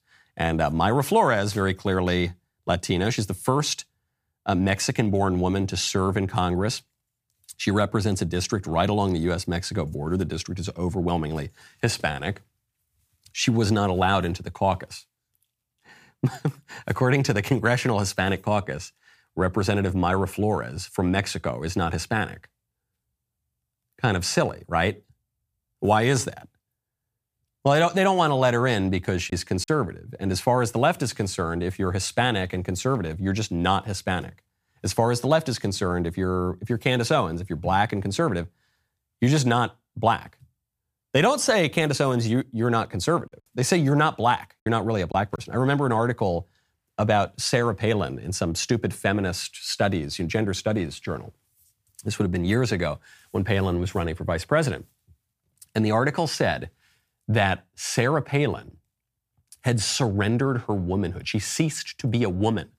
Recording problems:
choppy; occasionally; at 29 s and from 43 to 45 s; 2% of the speech affected

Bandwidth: 15 kHz